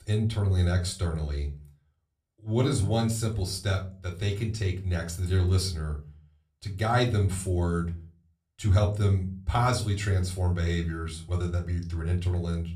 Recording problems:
room echo; very slight; dies away in 0.3 s
off-mic speech; somewhat distant

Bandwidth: 15 kHz